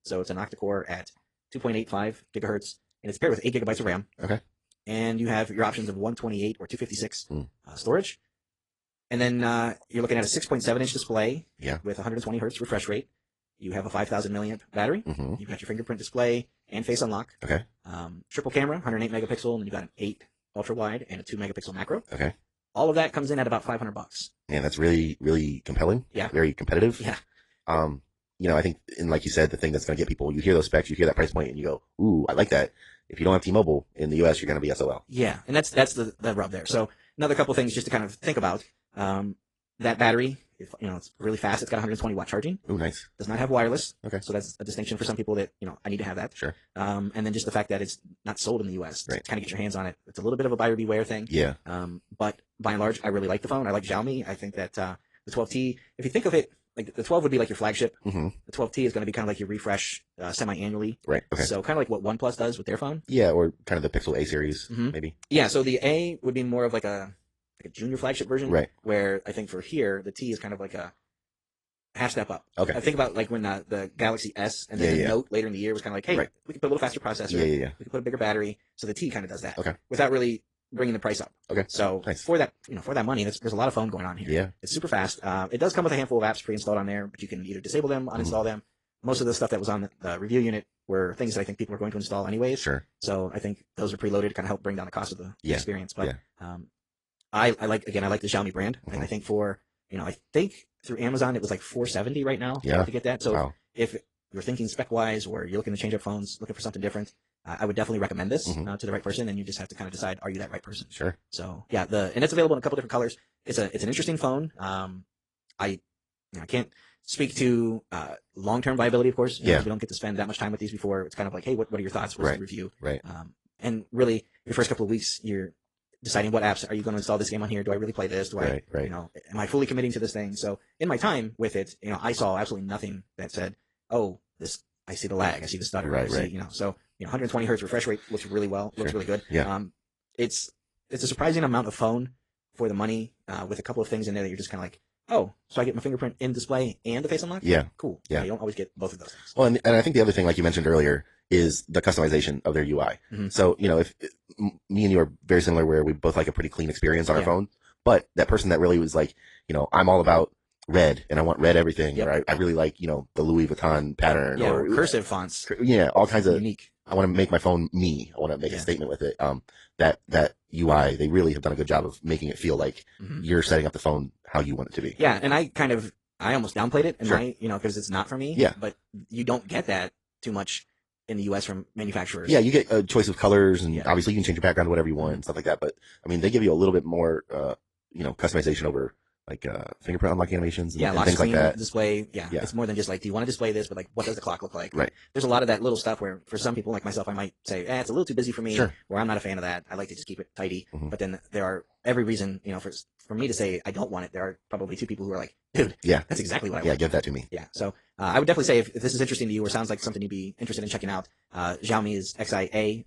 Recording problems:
wrong speed, natural pitch; too fast; 1.6 times normal speed
garbled, watery; slightly

